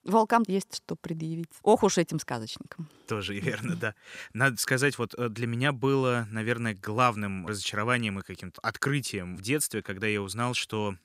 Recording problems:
none

